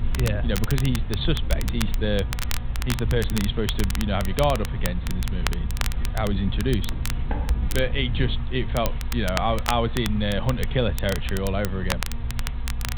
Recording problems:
high frequencies cut off; severe; nothing above 4 kHz
crackle, like an old record; loud; 9 dB below the speech
low rumble; noticeable; until 8.5 s; 20 dB below the speech
electrical hum; very faint; throughout; 60 Hz, 15 dB below the speech
footsteps; noticeable; at 7 s; peak 10 dB below the speech

